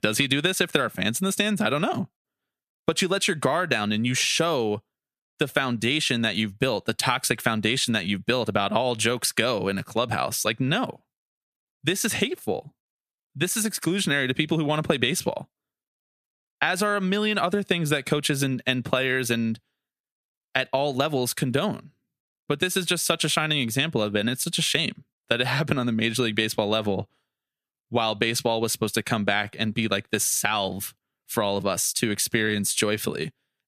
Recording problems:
squashed, flat; somewhat

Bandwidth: 14.5 kHz